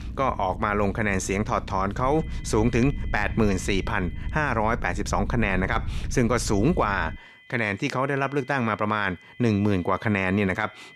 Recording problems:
high-pitched whine; faint; from 2 to 4.5 s and from 6.5 s on; 2 kHz, 25 dB below the speech
low rumble; faint; until 7 s; 25 dB below the speech

